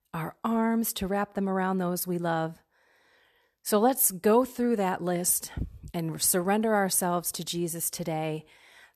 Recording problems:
none

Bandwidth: 13.5 kHz